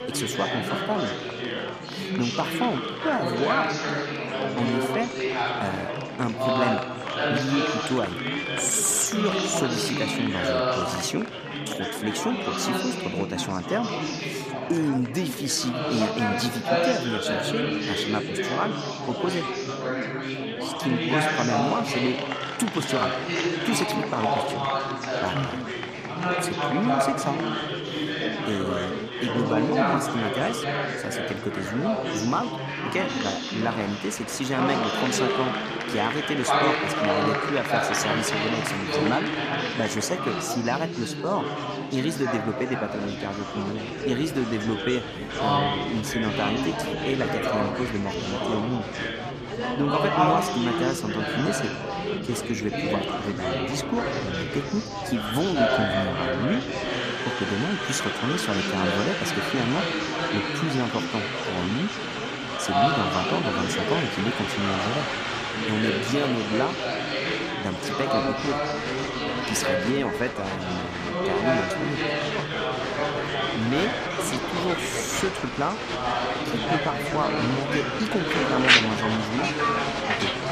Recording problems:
chatter from many people; very loud; throughout; 2 dB above the speech

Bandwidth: 14.5 kHz